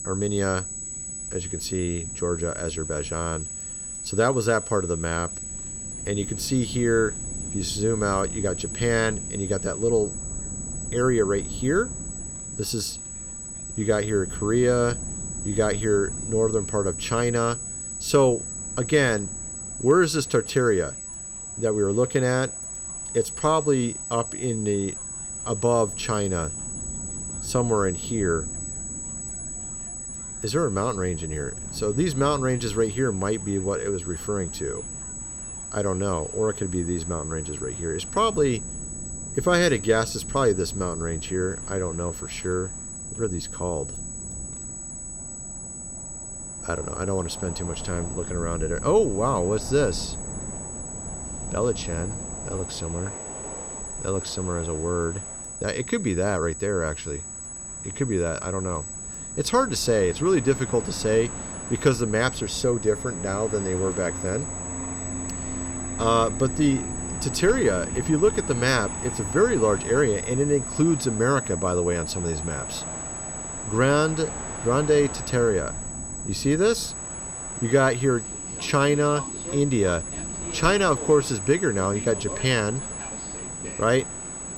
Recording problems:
high-pitched whine; loud; throughout; 8 kHz, 8 dB below the speech
train or aircraft noise; noticeable; throughout; 15 dB below the speech
wind noise on the microphone; occasional gusts; 25 dB below the speech

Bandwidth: 16.5 kHz